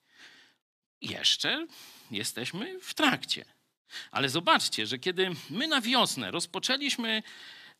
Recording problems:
thin; somewhat; fading below 300 Hz

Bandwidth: 14.5 kHz